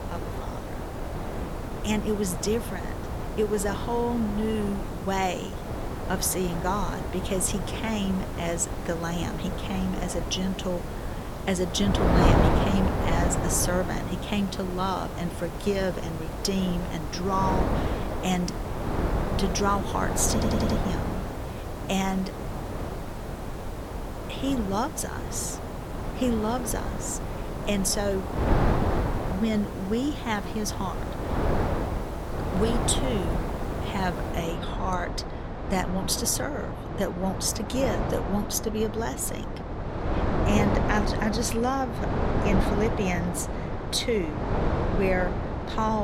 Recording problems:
wind noise on the microphone; heavy; 3 dB below the speech
hiss; noticeable; until 34 s; 20 dB below the speech
audio stuttering; at 20 s
abrupt cut into speech; at the end

